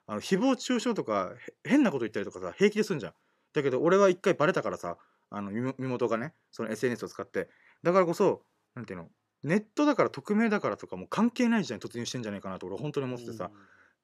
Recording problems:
none

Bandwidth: 14.5 kHz